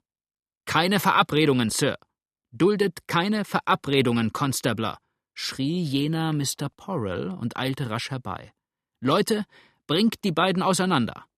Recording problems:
none

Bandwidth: 14.5 kHz